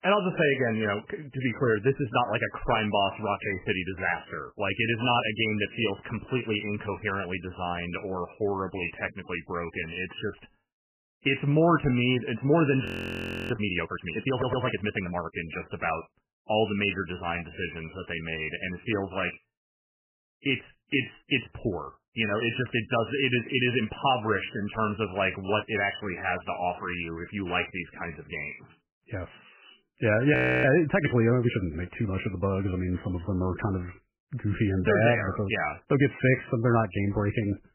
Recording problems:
garbled, watery; badly; nothing above 3 kHz
audio freezing; at 13 s for 0.5 s and at 30 s
audio stuttering; at 14 s

